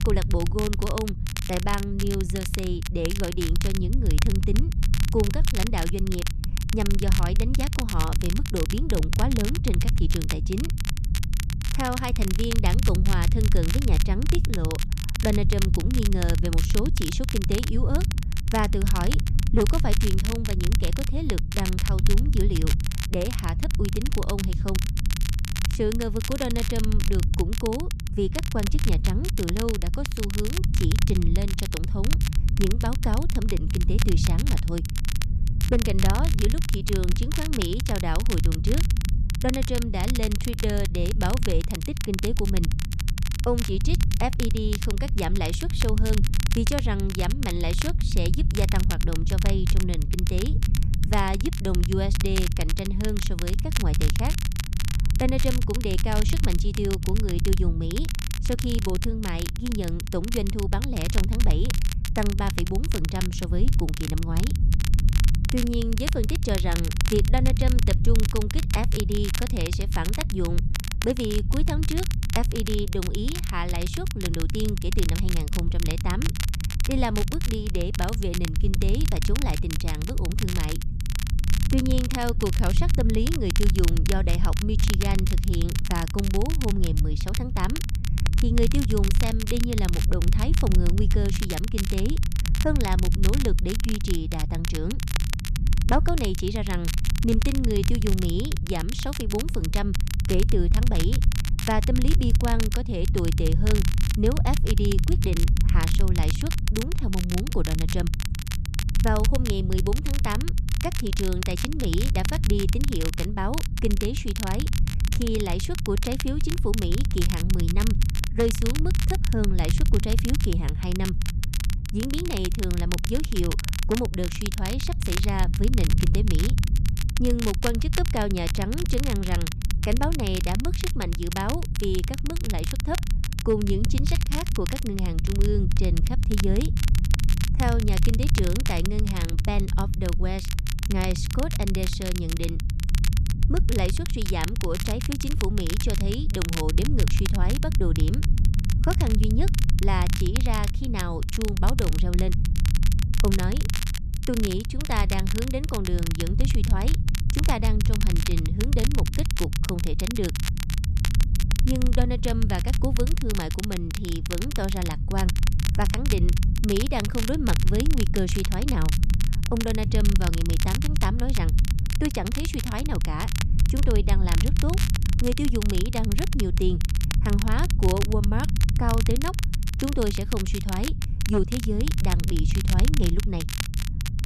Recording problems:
crackle, like an old record; loud; 5 dB below the speech
low rumble; noticeable; throughout; 10 dB below the speech

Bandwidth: 14 kHz